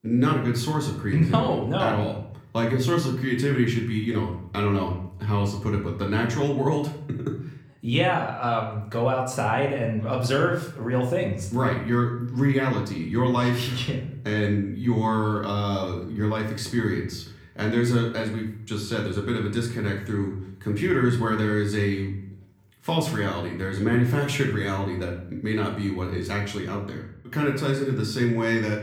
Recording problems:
room echo; slight; dies away in 0.6 s
off-mic speech; somewhat distant

